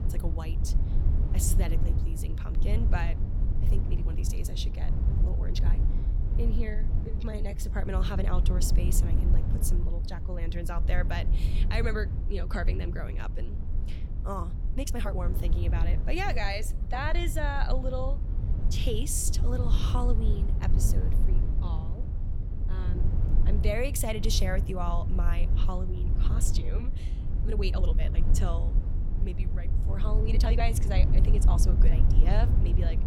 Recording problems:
low rumble; loud; throughout; 8 dB below the speech
uneven, jittery; strongly; from 3.5 to 32 s

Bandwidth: 17 kHz